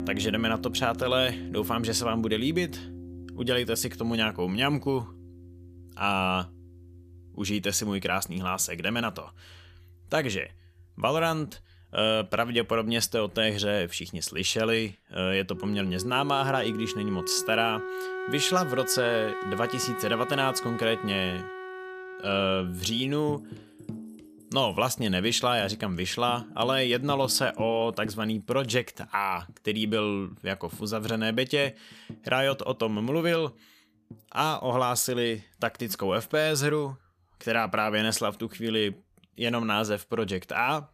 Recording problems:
background music; noticeable; throughout; 10 dB below the speech

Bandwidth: 14.5 kHz